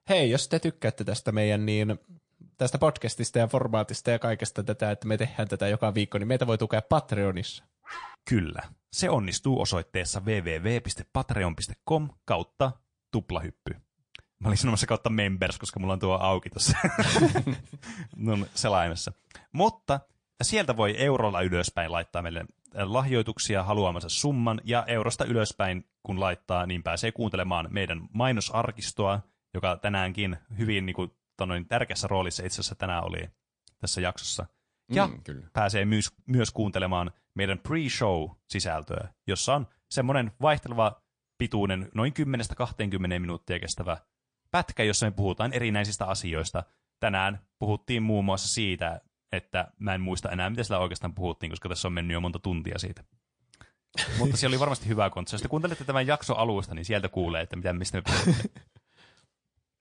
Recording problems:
garbled, watery; slightly; nothing above 9 kHz
dog barking; faint; at 8 s; peak 15 dB below the speech

